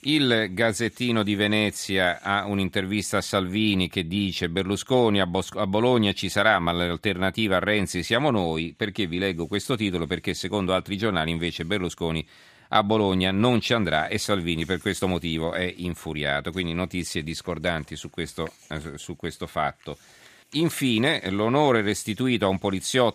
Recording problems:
none

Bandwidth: 14.5 kHz